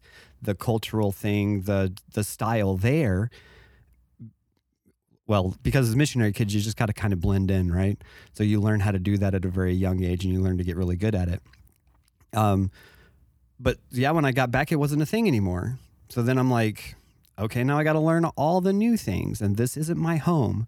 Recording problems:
none

